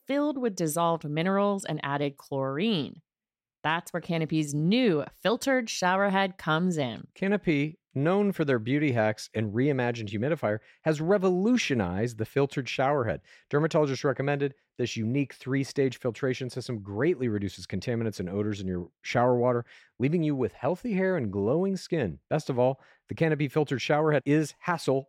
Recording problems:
none

